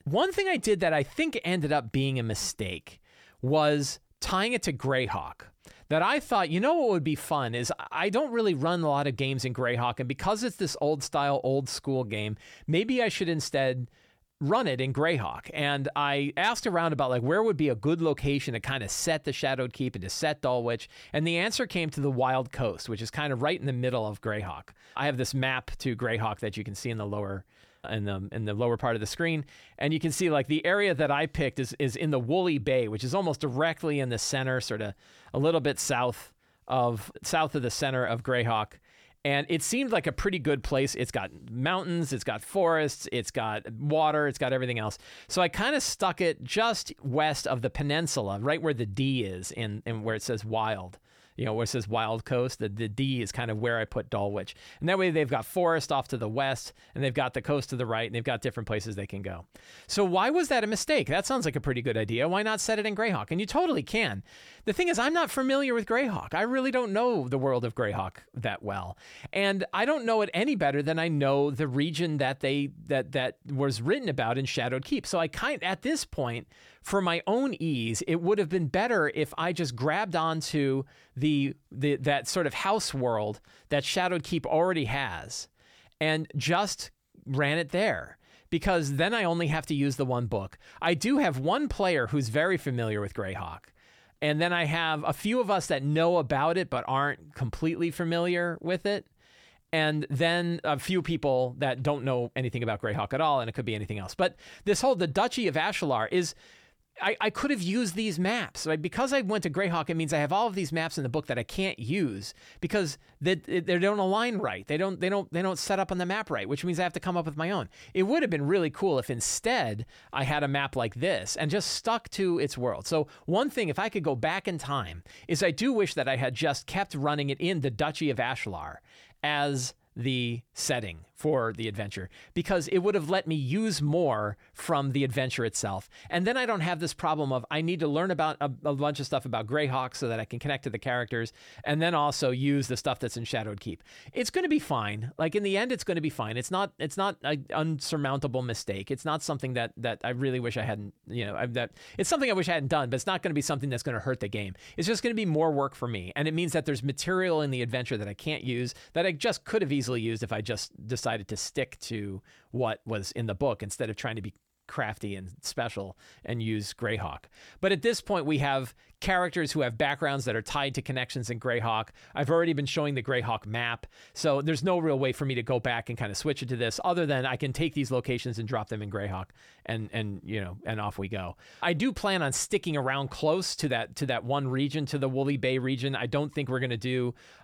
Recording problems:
none

